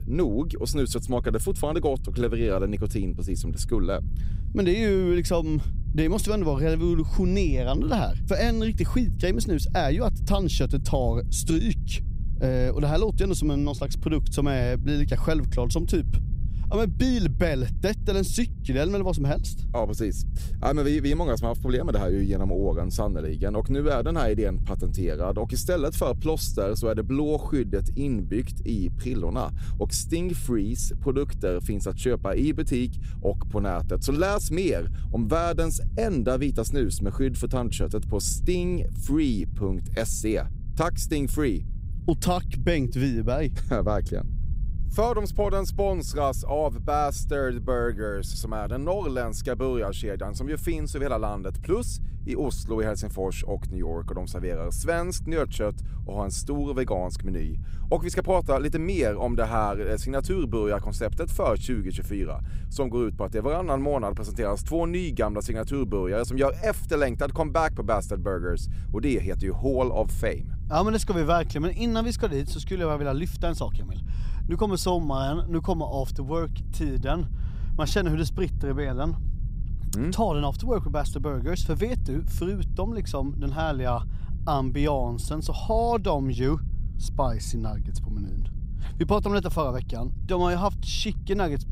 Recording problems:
low rumble; faint; throughout; 20 dB below the speech

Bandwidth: 15.5 kHz